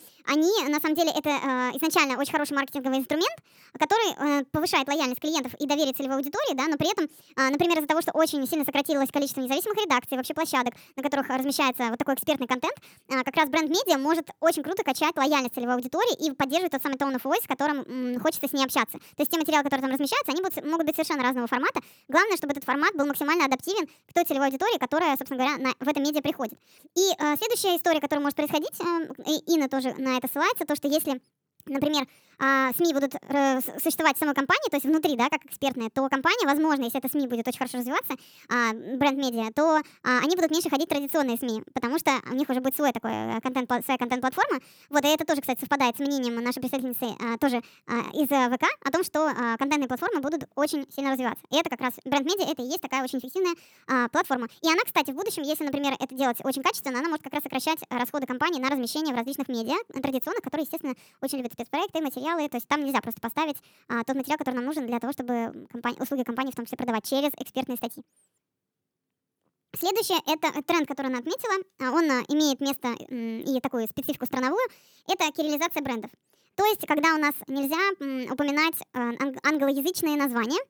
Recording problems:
wrong speed and pitch; too fast and too high; 1.5 times normal speed

